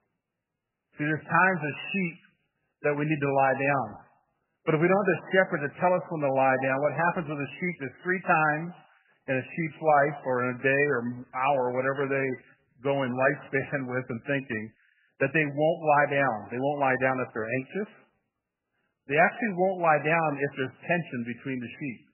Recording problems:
garbled, watery; badly; nothing above 2.5 kHz

